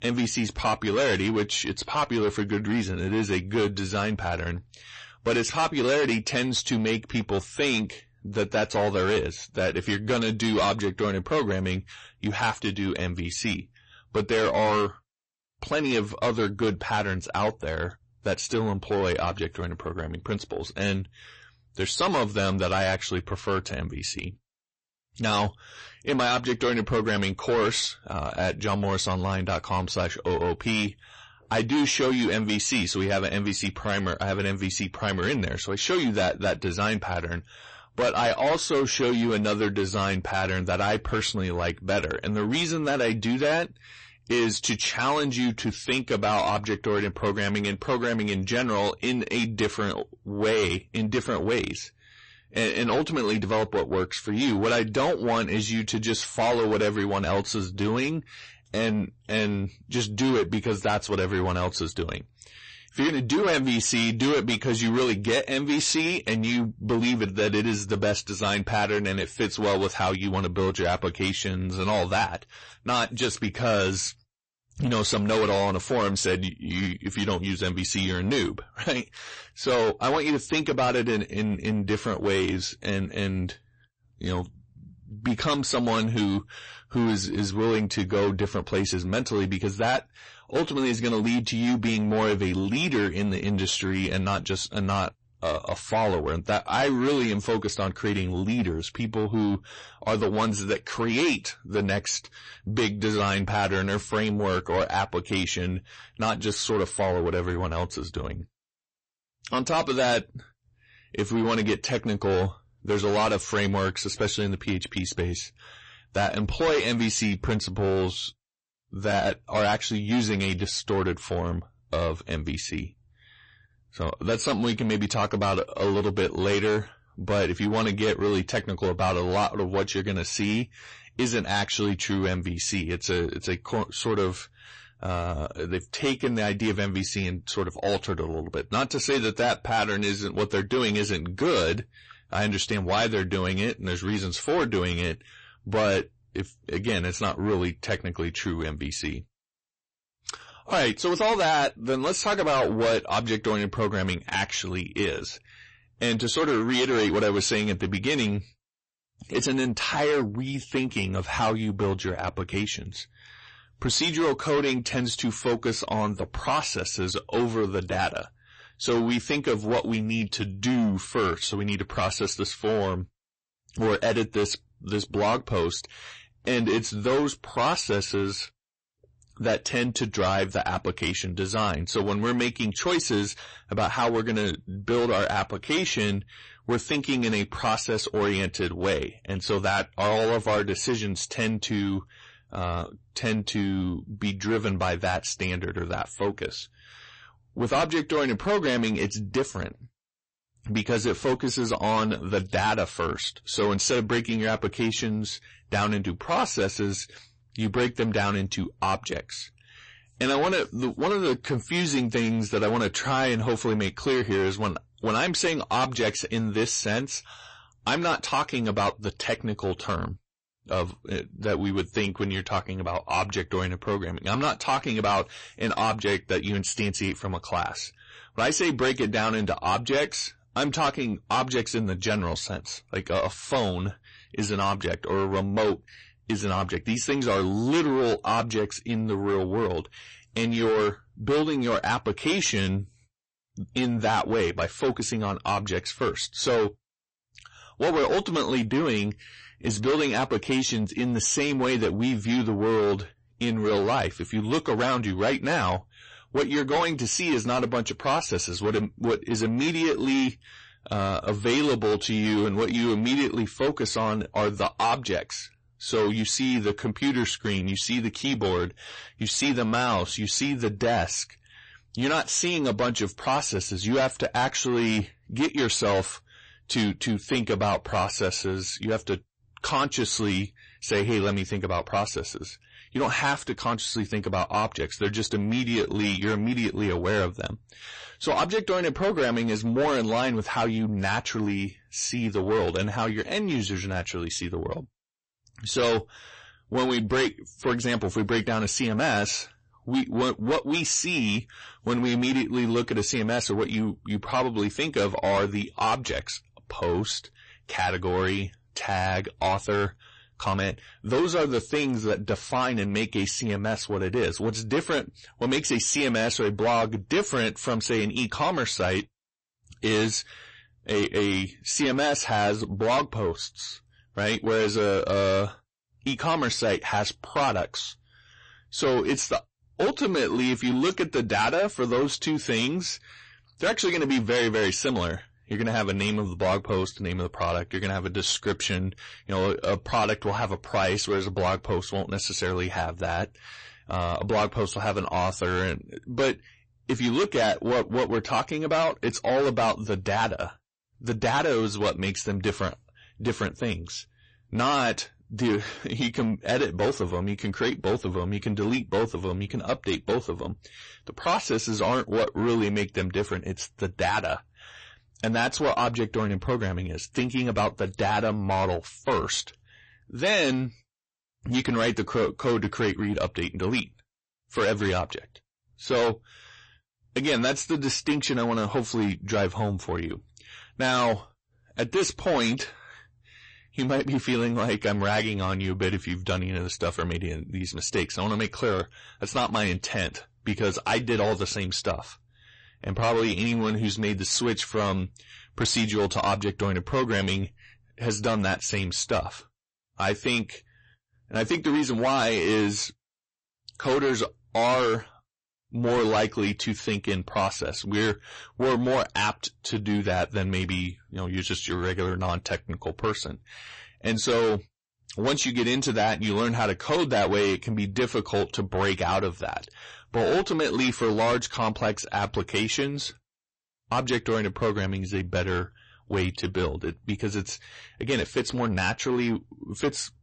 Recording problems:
distortion; heavy; 7 dB below the speech
garbled, watery; slightly; nothing above 8 kHz

